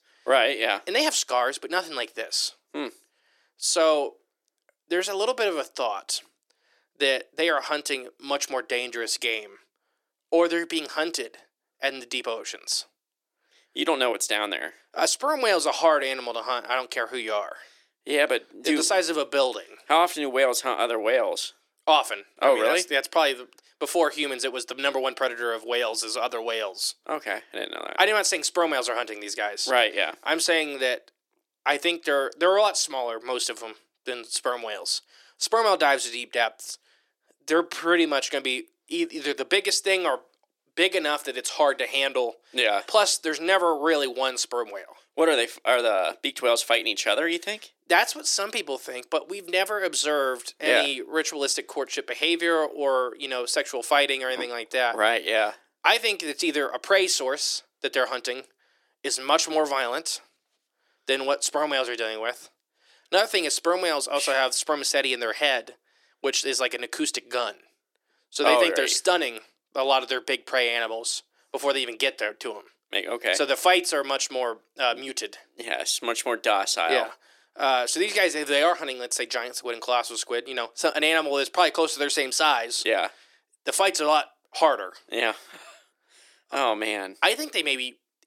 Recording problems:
thin; somewhat; fading below 300 Hz

